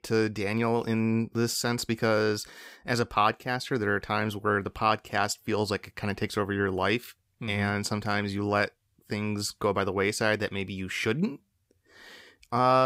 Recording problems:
abrupt cut into speech; at the end

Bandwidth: 15.5 kHz